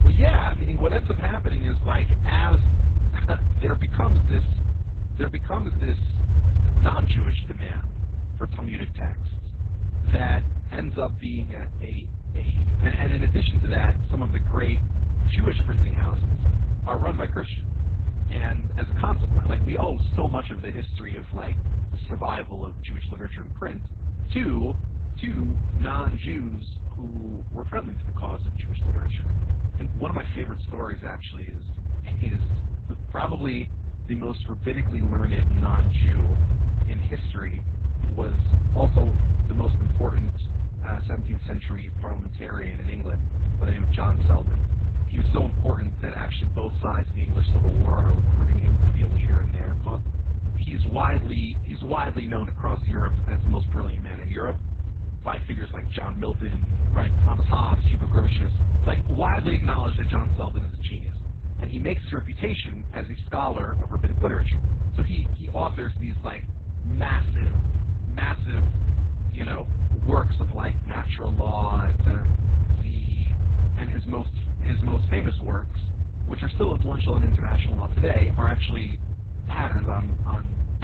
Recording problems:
garbled, watery; badly; nothing above 4 kHz
low rumble; loud; throughout; 7 dB below the speech

